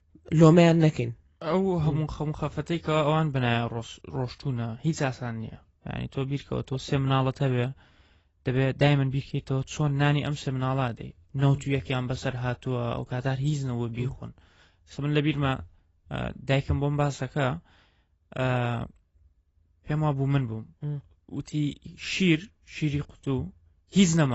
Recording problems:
garbled, watery; badly; nothing above 7.5 kHz
abrupt cut into speech; at the end

